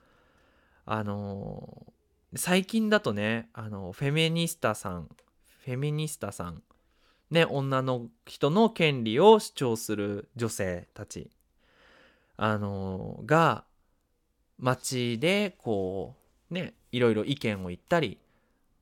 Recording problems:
none

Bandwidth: 17 kHz